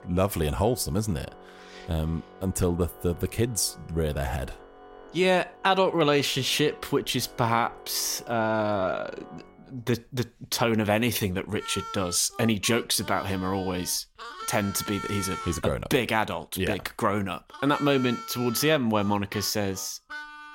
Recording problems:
background music; noticeable; throughout; 15 dB below the speech

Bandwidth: 16 kHz